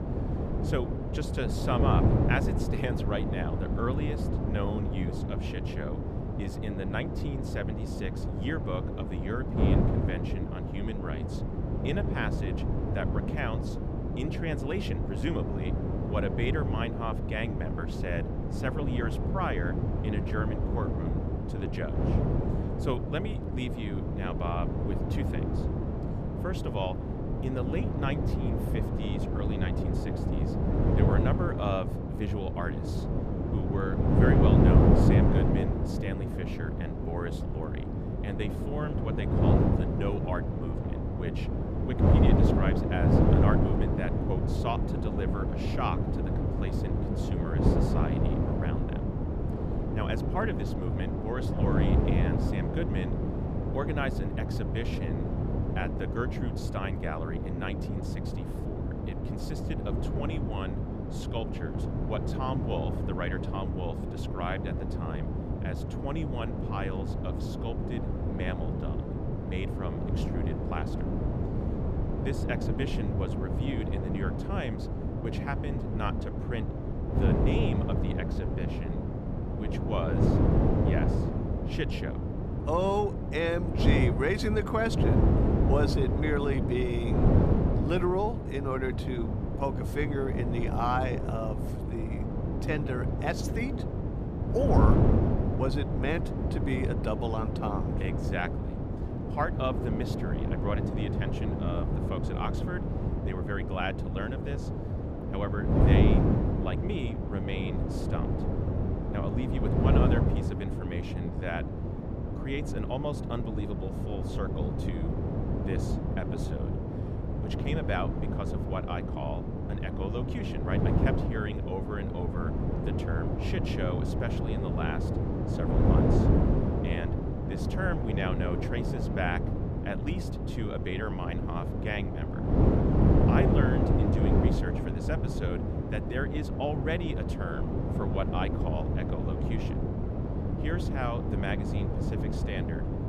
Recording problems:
wind noise on the microphone; heavy; as loud as the speech

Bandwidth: 14.5 kHz